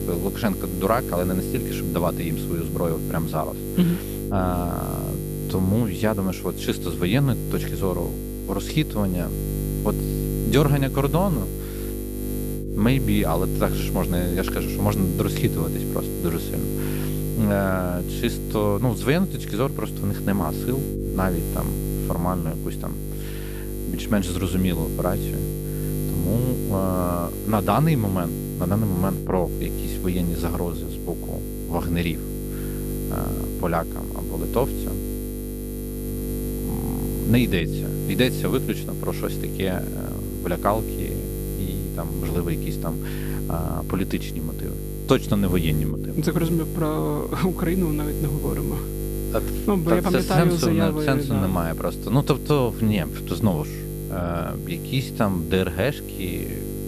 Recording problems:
electrical hum; loud; throughout; 50 Hz, 7 dB below the speech

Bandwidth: 14.5 kHz